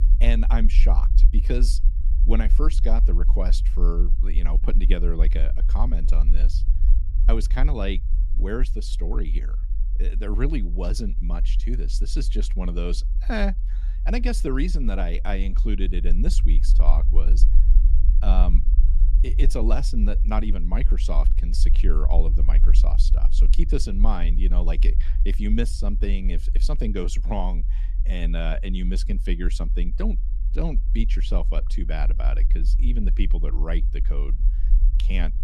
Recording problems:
low rumble; noticeable; throughout; 15 dB below the speech

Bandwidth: 15 kHz